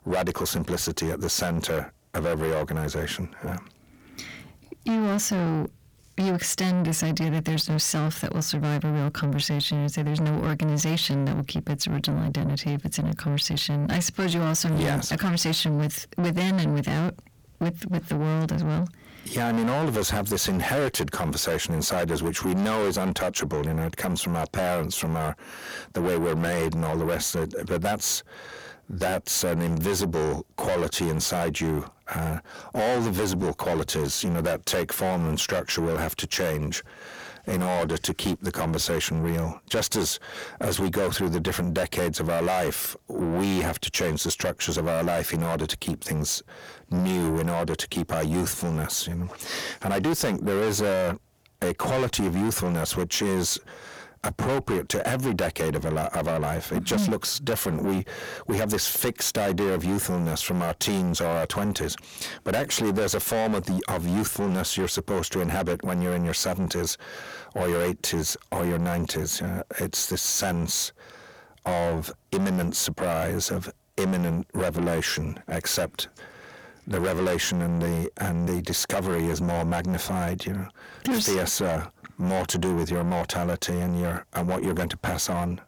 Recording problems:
distortion; heavy; 6 dB below the speech

